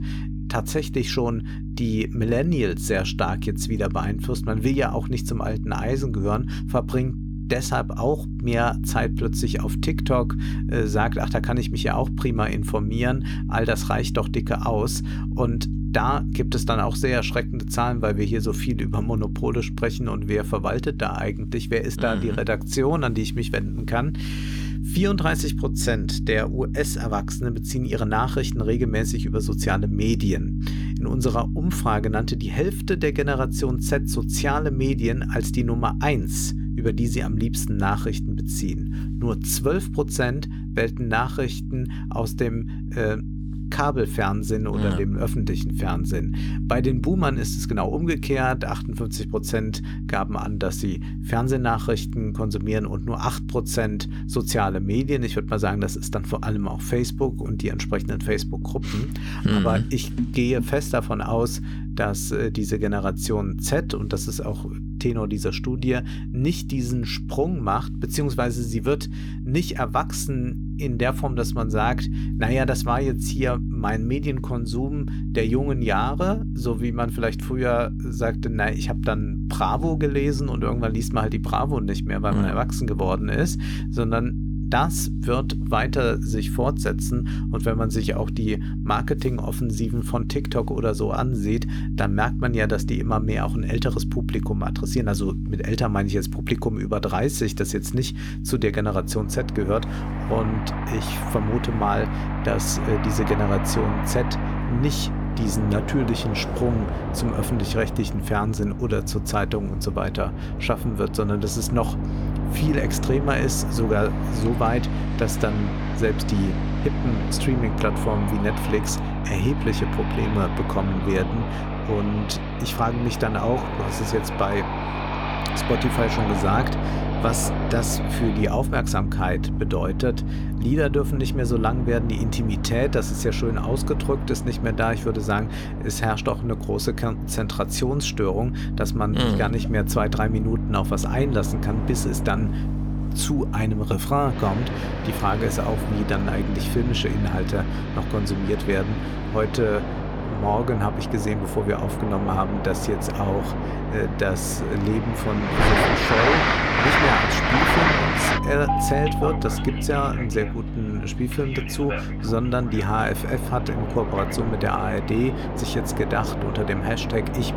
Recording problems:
train or aircraft noise; loud; from 1:39 on; 4 dB below the speech
electrical hum; noticeable; throughout; 50 Hz, 10 dB below the speech

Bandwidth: 18.5 kHz